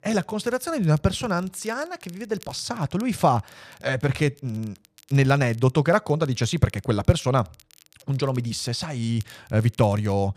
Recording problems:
crackle, like an old record; faint; 30 dB below the speech

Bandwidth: 14.5 kHz